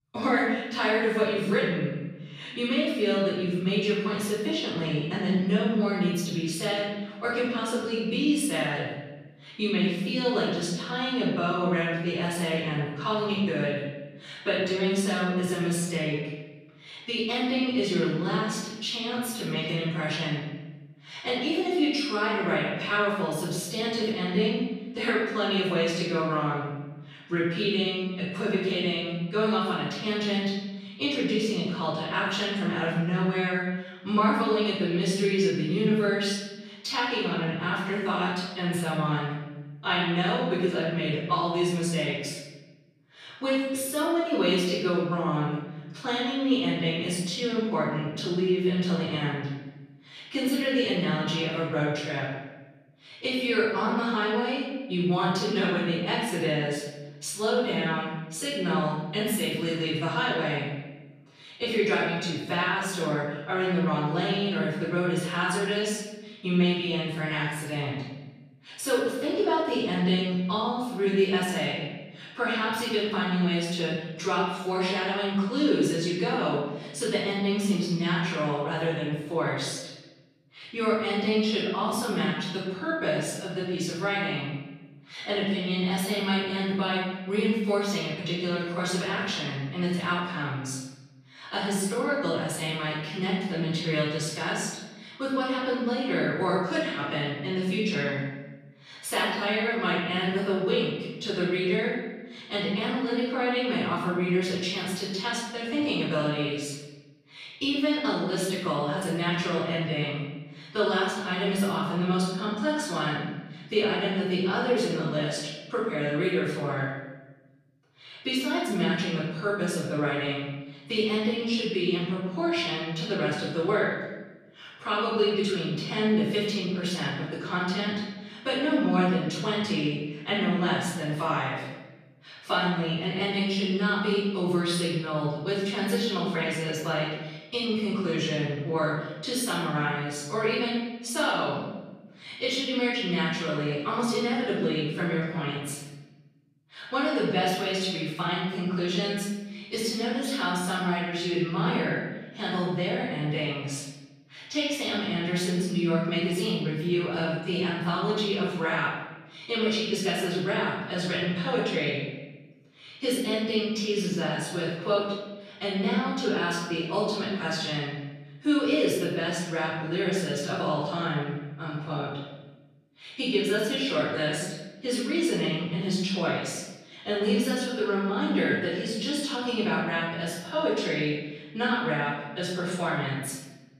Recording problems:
off-mic speech; far
room echo; noticeable; dies away in 1.1 s

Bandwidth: 14.5 kHz